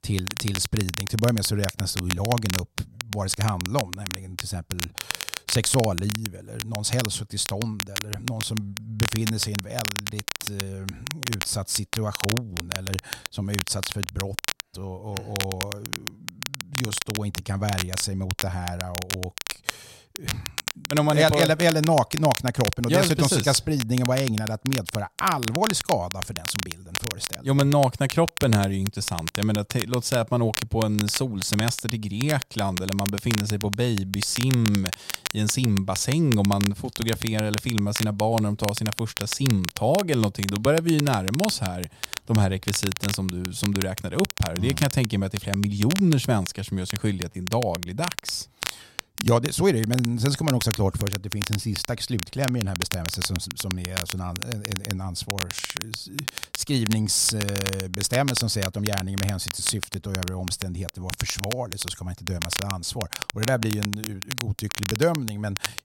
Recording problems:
crackle, like an old record; loud; 6 dB below the speech
choppy; occasionally; at 47 s; 3% of the speech affected

